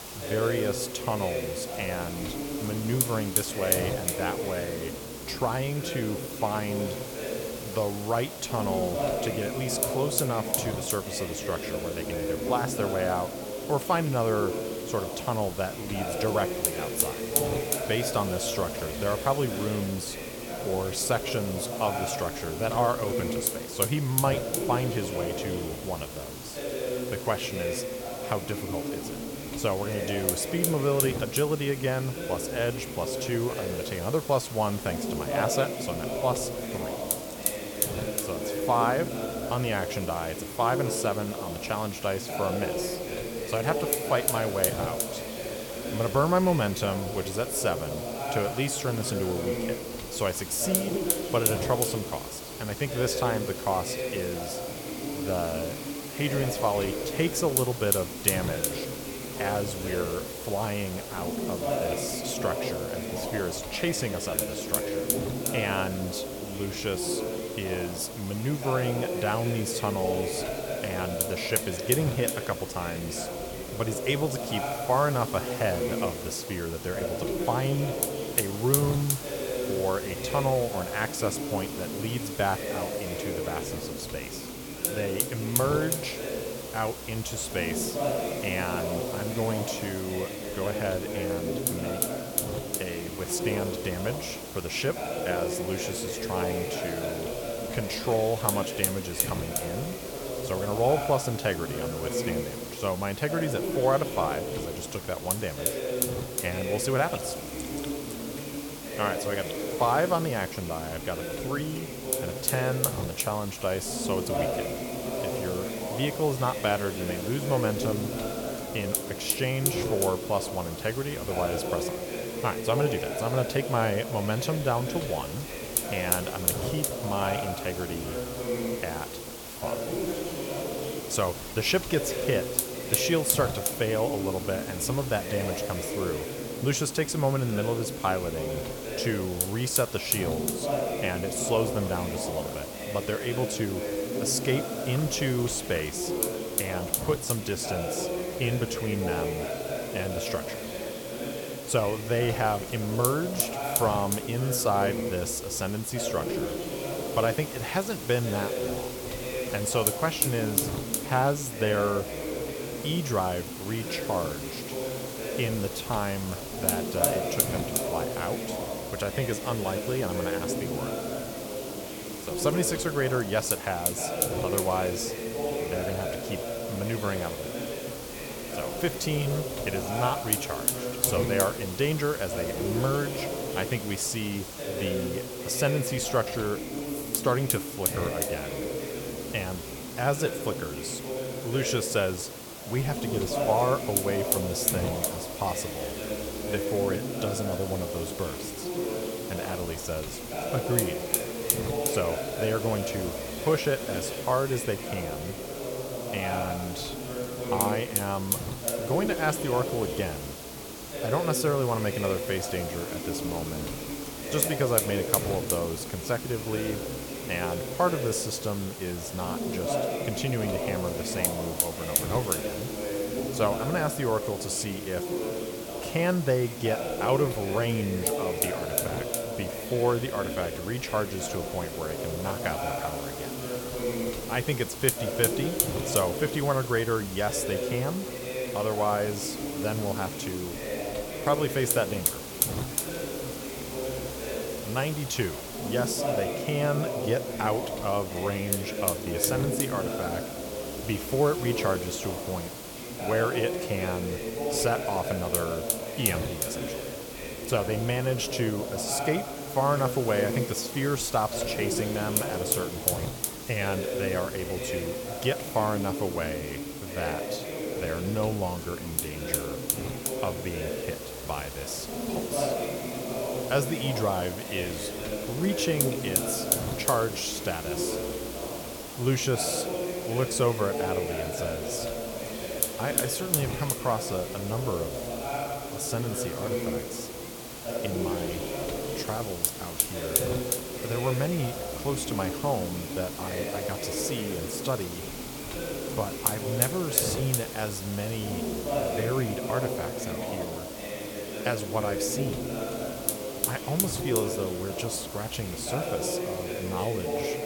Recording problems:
chatter from many people; loud; throughout; 4 dB below the speech
hiss; loud; throughout; 4 dB below the speech
animal sounds; faint; throughout; 30 dB below the speech

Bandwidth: 17.5 kHz